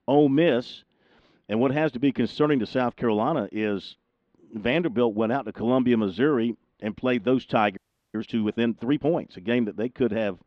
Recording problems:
muffled; slightly; fading above 4 kHz
audio freezing; at 8 s

